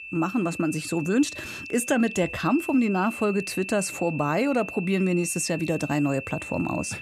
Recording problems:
high-pitched whine; loud; throughout; 2.5 kHz, 10 dB below the speech

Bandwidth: 14.5 kHz